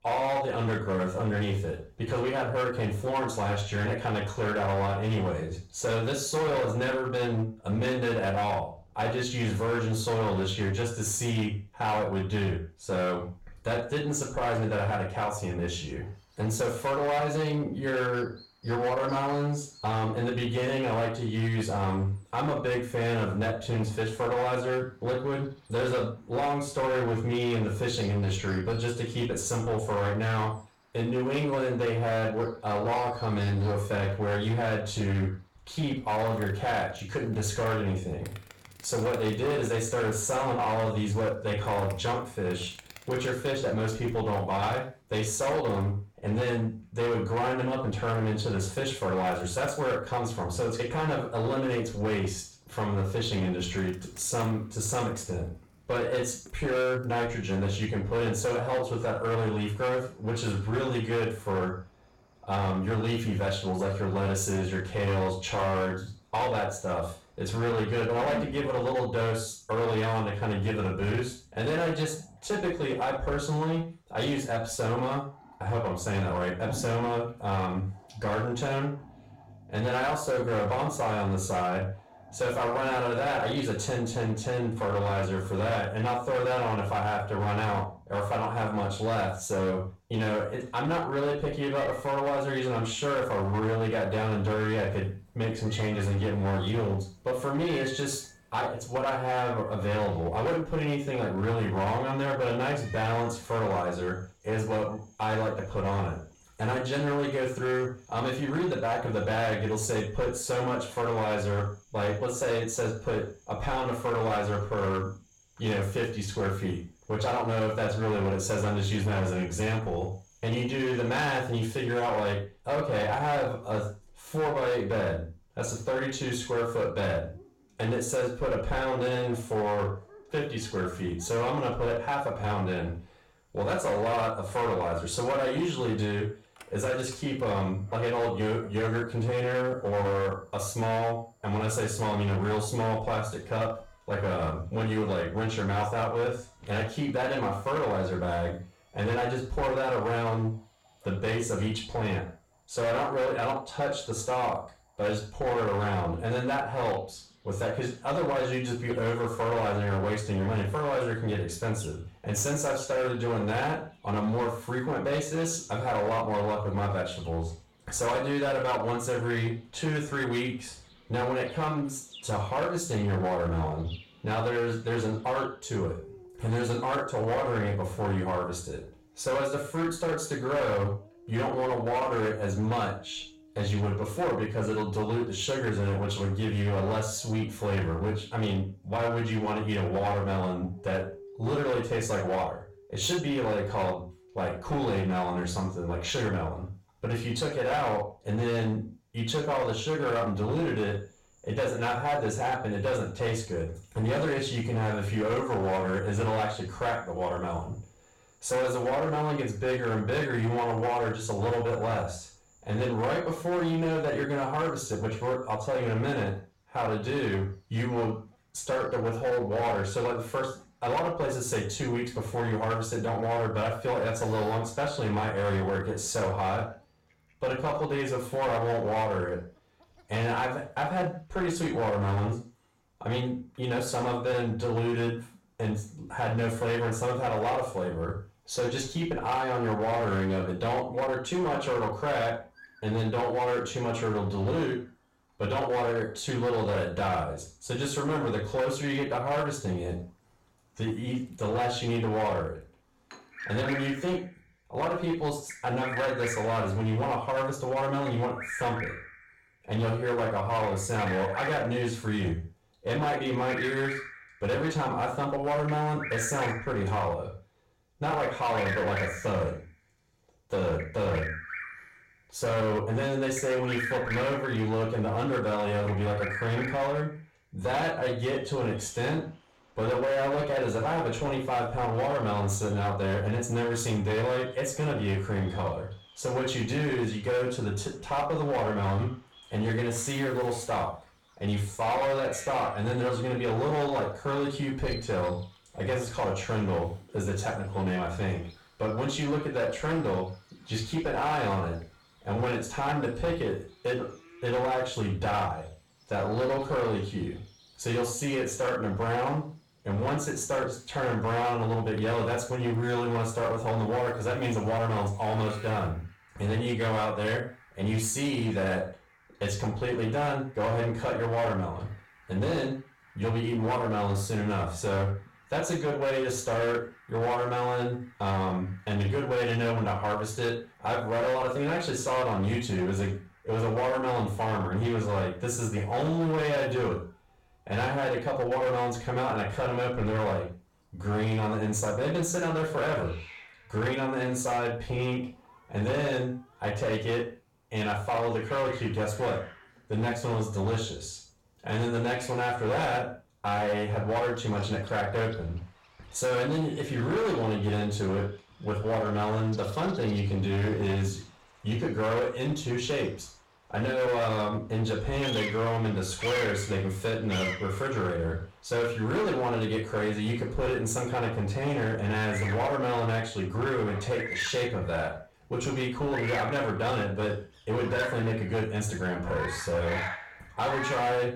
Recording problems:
off-mic speech; far
room echo; noticeable; dies away in 0.4 s
distortion; slight; 15% of the sound clipped
animal sounds; noticeable; throughout; 15 dB below the speech

